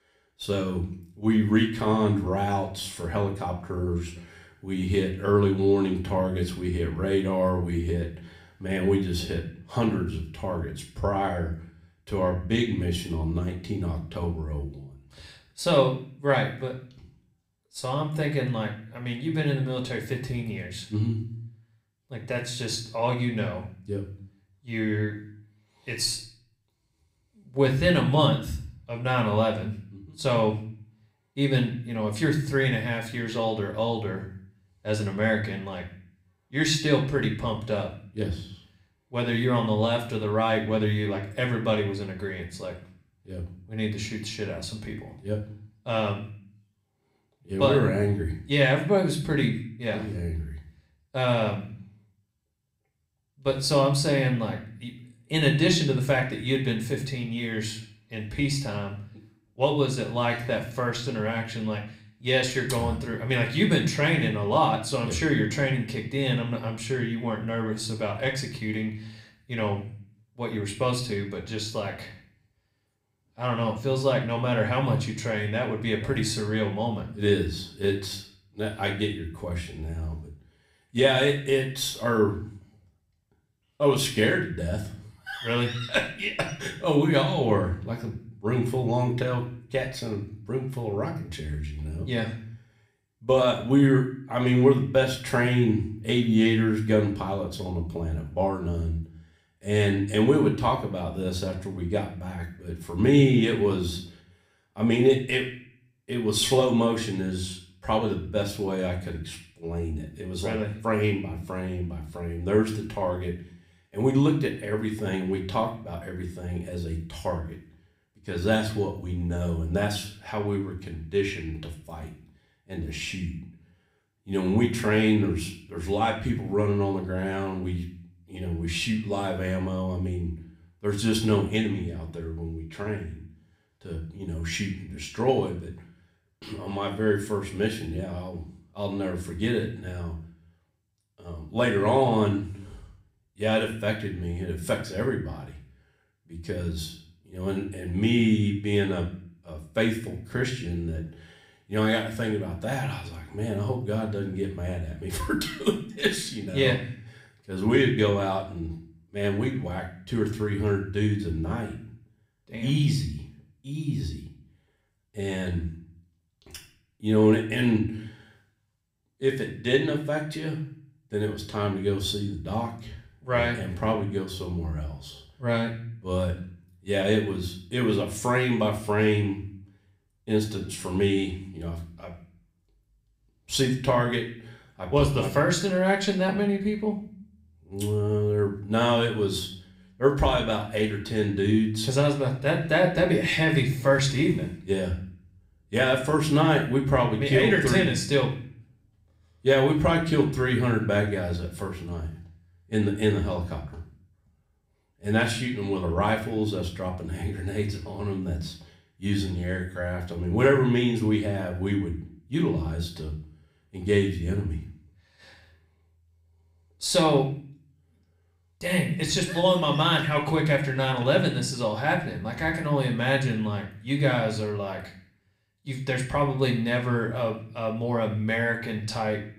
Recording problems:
room echo; slight; dies away in 0.5 s
off-mic speech; somewhat distant

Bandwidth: 15.5 kHz